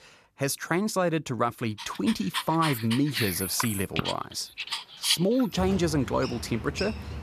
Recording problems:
animal sounds; loud; from 2 s on; 5 dB below the speech

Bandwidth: 14.5 kHz